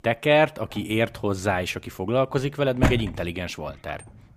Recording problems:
household noises; loud; throughout; 4 dB below the speech

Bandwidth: 15 kHz